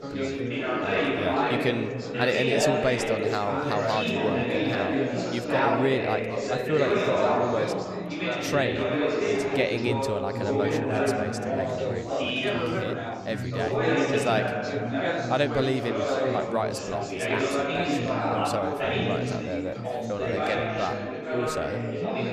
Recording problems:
chatter from many people; very loud; throughout; 3 dB above the speech

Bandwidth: 14.5 kHz